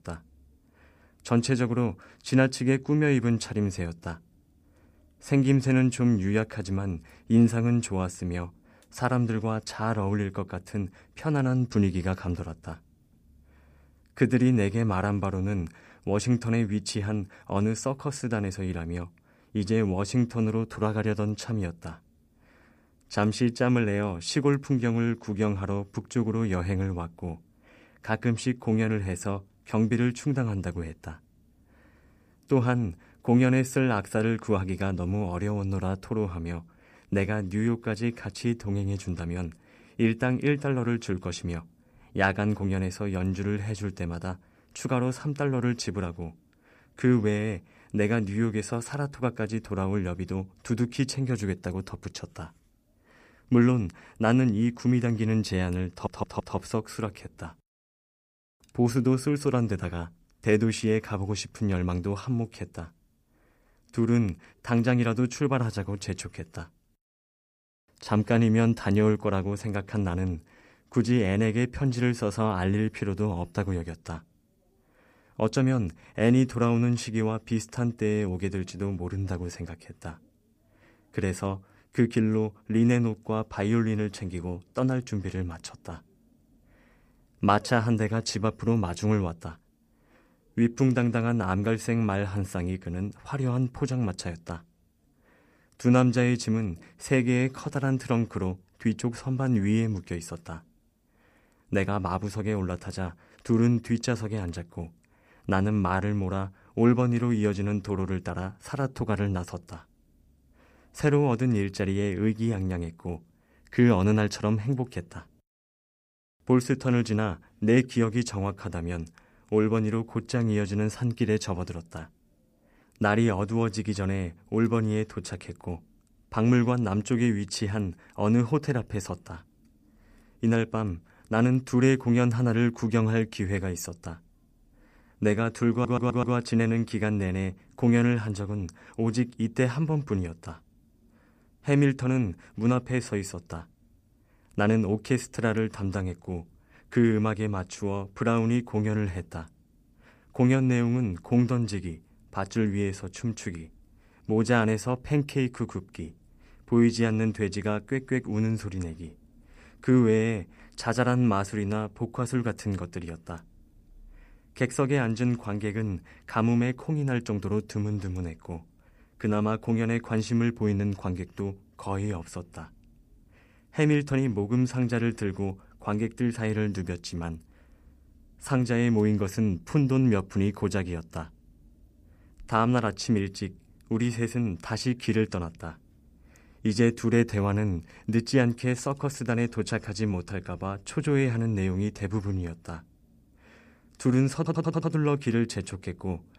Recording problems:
audio stuttering; at 56 s, at 2:16 and at 3:14

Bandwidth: 15 kHz